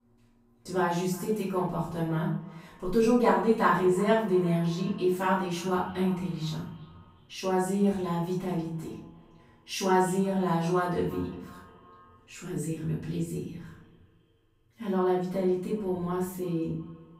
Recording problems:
off-mic speech; far
room echo; noticeable; dies away in 0.5 s
echo of what is said; faint; throughout; 350 ms later, 20 dB below the speech

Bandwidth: 15.5 kHz